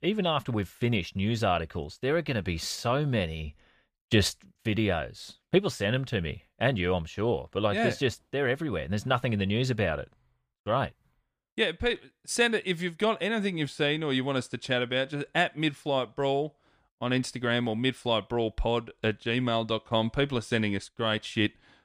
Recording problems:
none

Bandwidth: 15 kHz